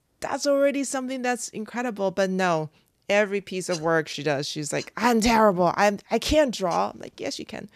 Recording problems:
none

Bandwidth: 14.5 kHz